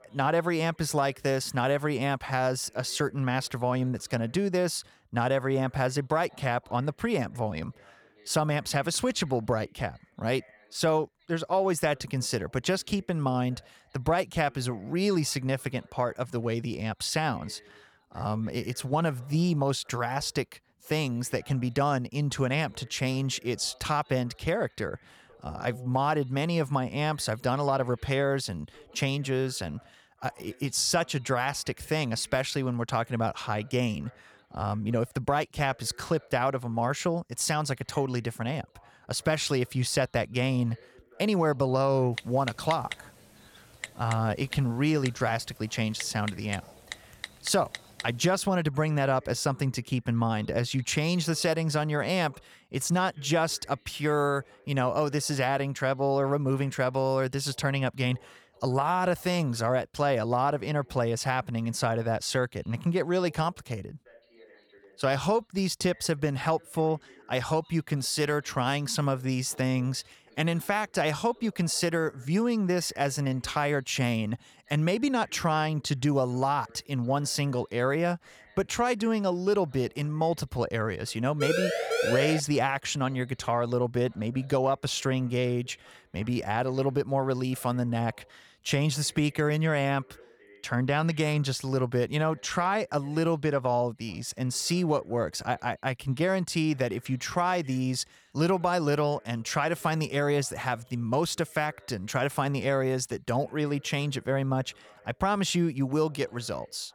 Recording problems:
background chatter; faint; throughout; 2 voices, 30 dB below the speech
keyboard typing; noticeable; from 42 to 48 s; peak 9 dB below the speech
siren; loud; from 1:21 to 1:22; peak 1 dB above the speech

